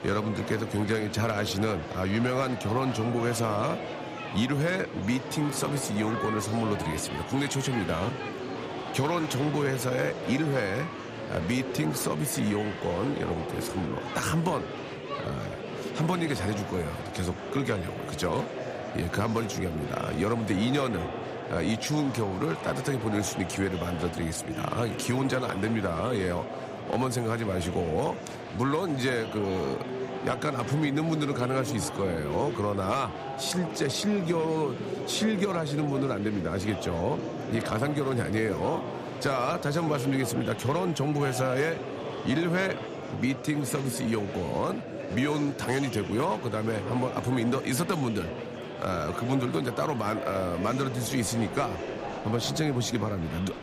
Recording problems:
murmuring crowd; loud; throughout; 7 dB below the speech

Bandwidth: 14.5 kHz